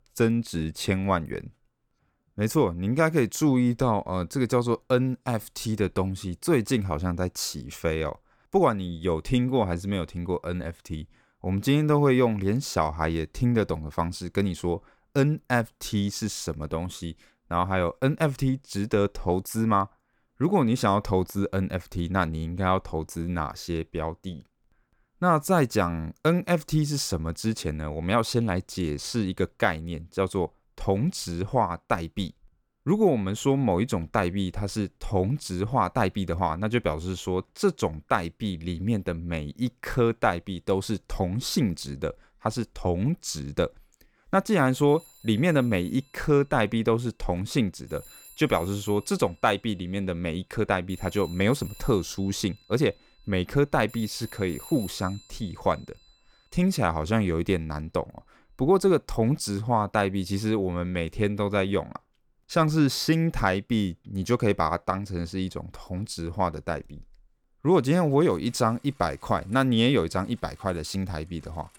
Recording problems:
alarms or sirens; faint; throughout; 25 dB below the speech

